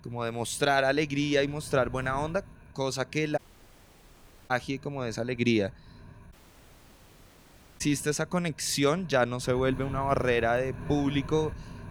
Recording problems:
wind noise on the microphone; occasional gusts; 20 dB below the speech
audio cutting out; at 3.5 s for 1 s and at 6.5 s for 1.5 s

